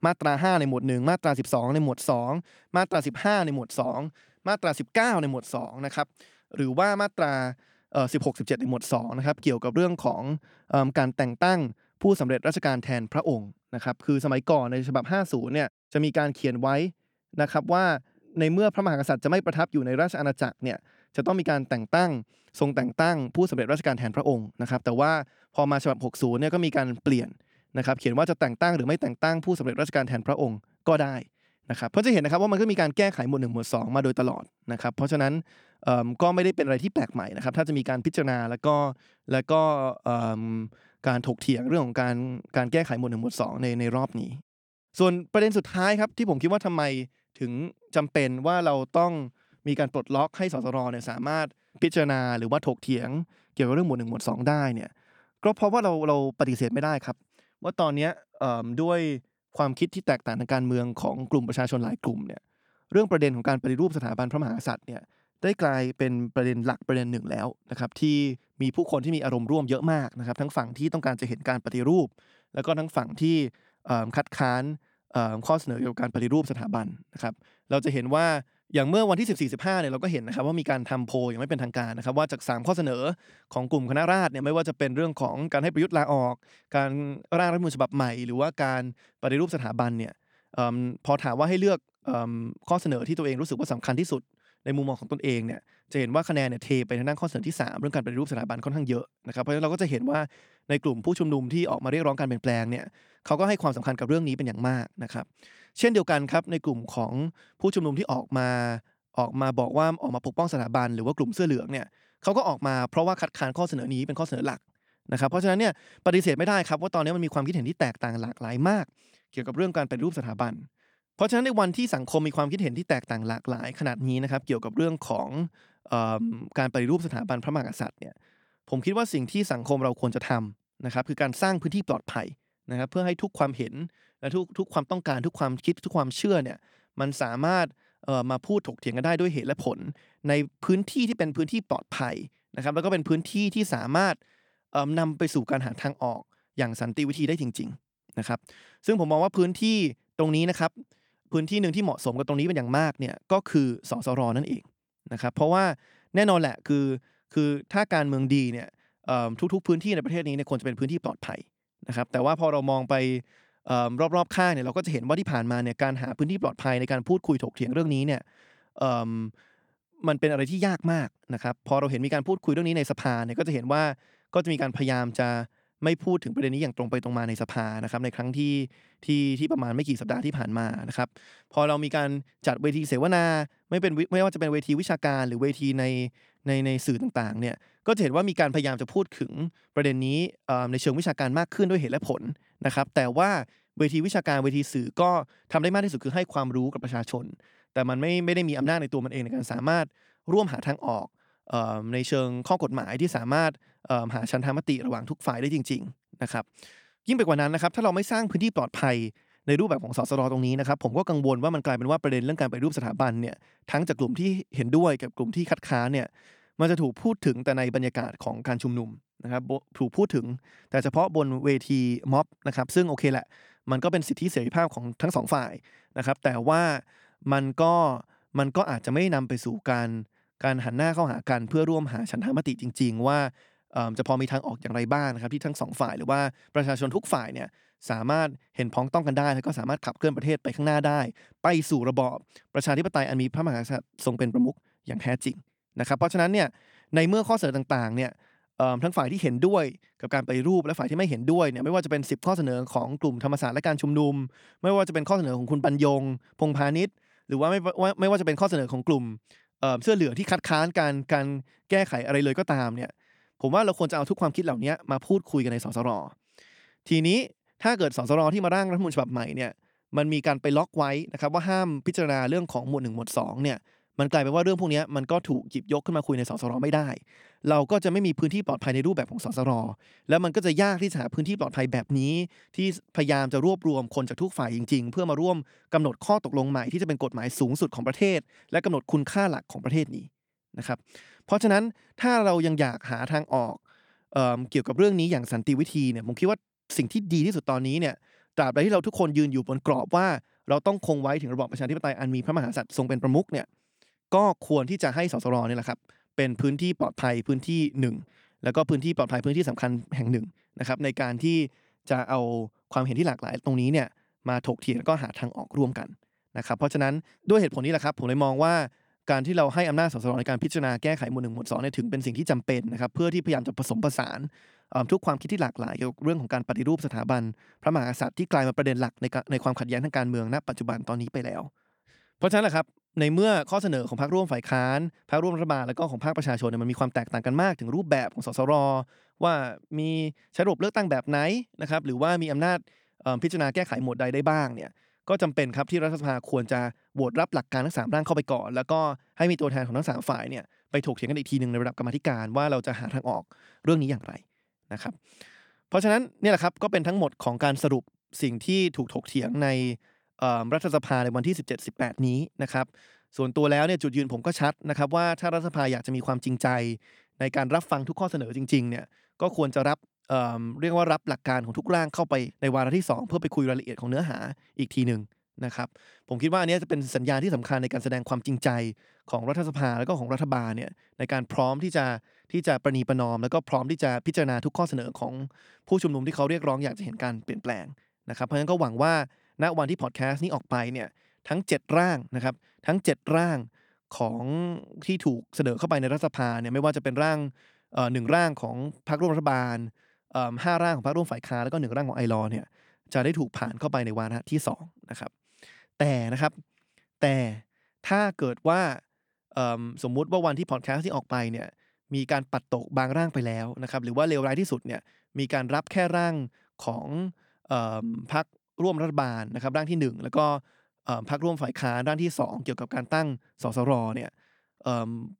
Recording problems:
none

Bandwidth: 18.5 kHz